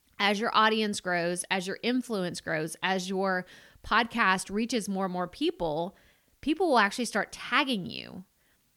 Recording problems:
none

